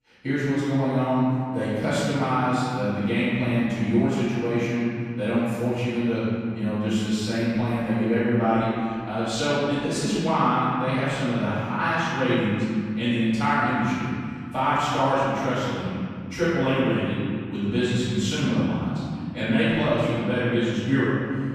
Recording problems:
room echo; strong; dies away in 2.4 s
off-mic speech; far

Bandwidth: 15 kHz